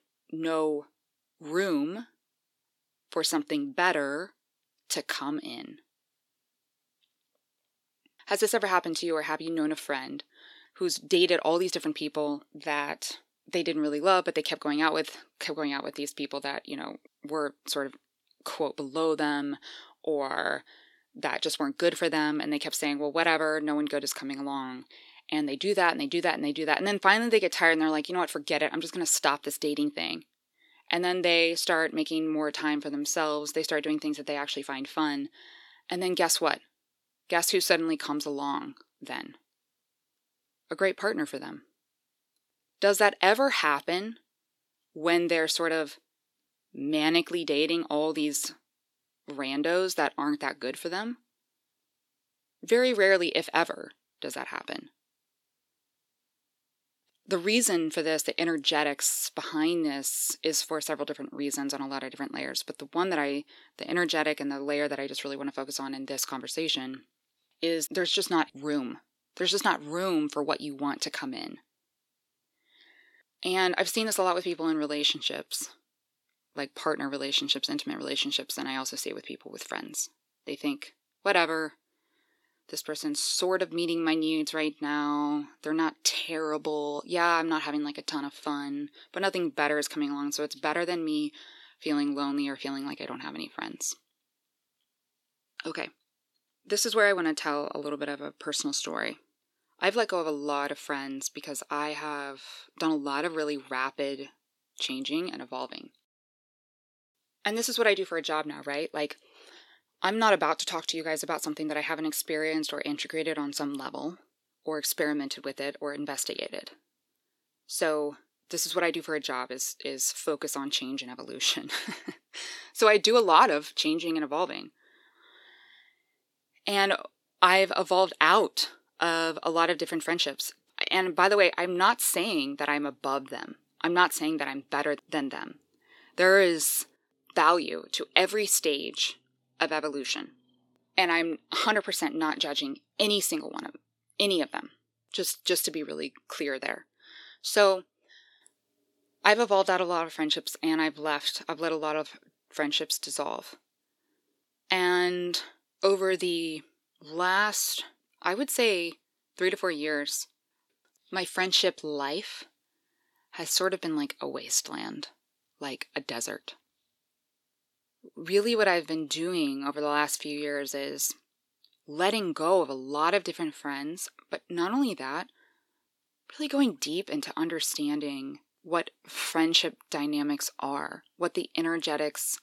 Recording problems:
thin; very slightly; fading below 400 Hz

